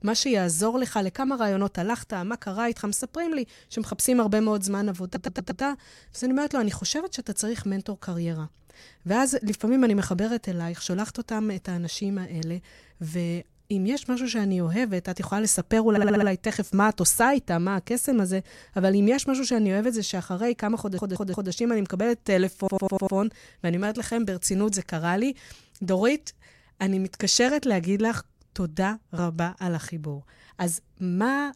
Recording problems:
audio stuttering; 4 times, first at 5 s

